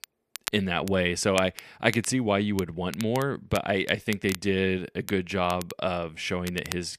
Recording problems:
crackle, like an old record; noticeable; 15 dB below the speech

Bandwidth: 14.5 kHz